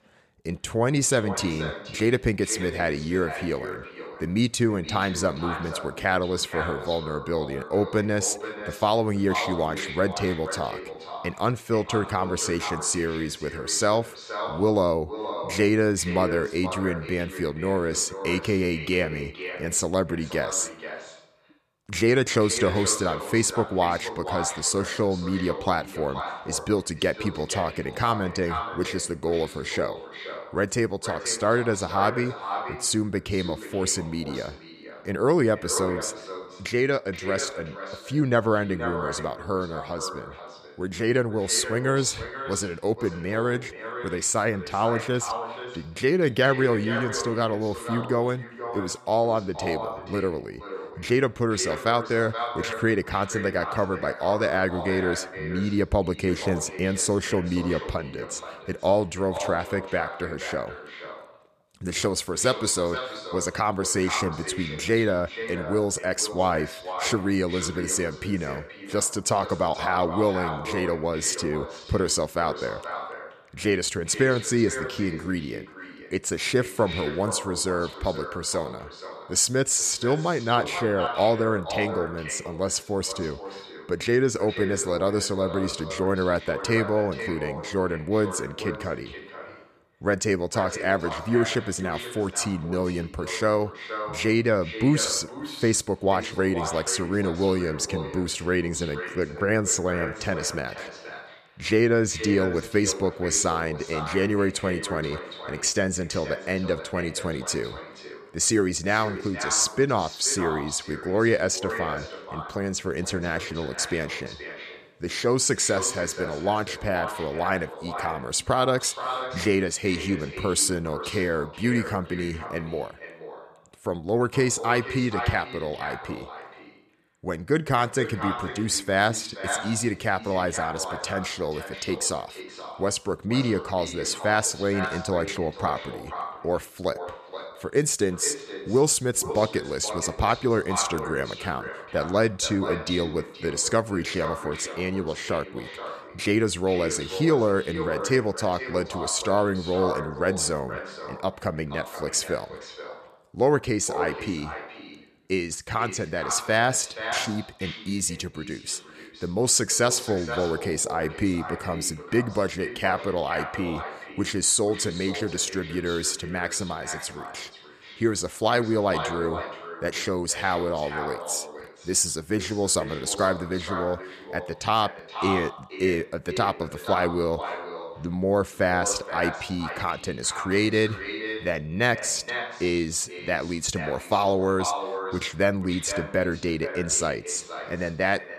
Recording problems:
echo of what is said; strong; throughout; 470 ms later, 10 dB below the speech

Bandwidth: 14.5 kHz